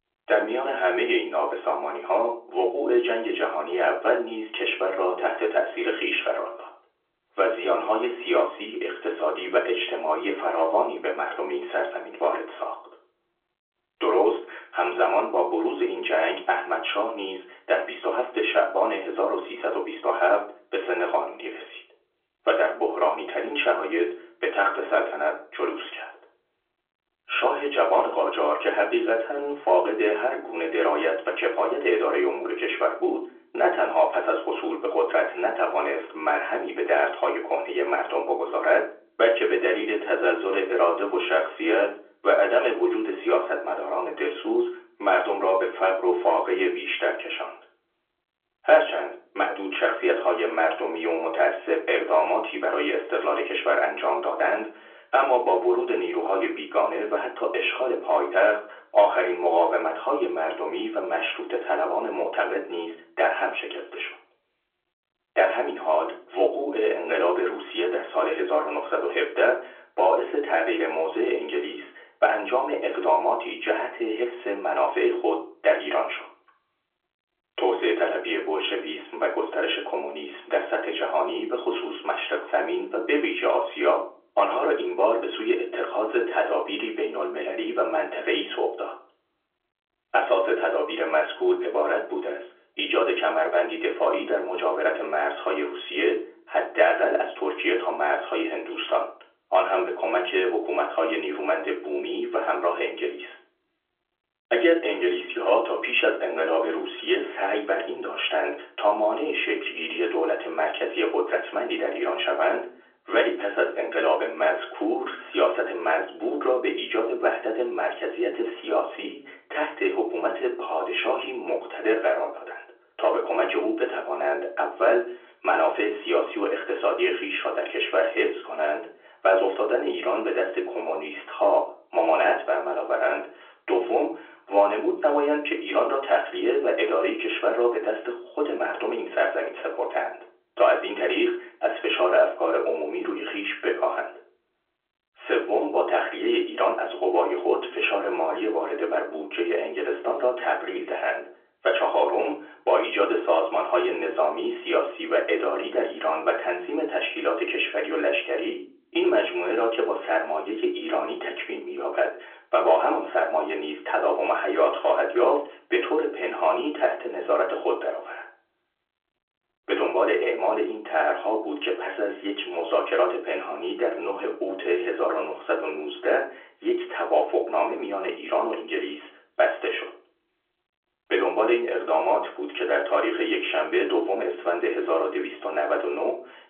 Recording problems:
off-mic speech; far
room echo; slight; dies away in 0.4 s
phone-call audio; nothing above 3.5 kHz

